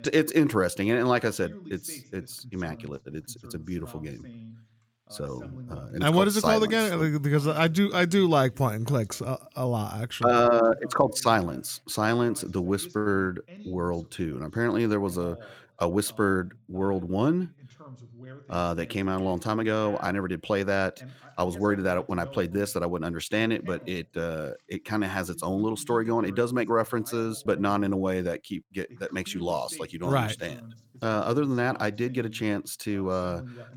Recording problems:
voice in the background; faint; throughout; 20 dB below the speech

